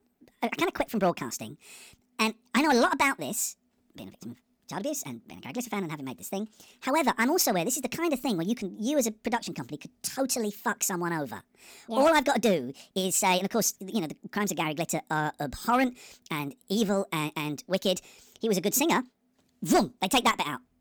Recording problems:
wrong speed and pitch; too fast and too high; 1.5 times normal speed

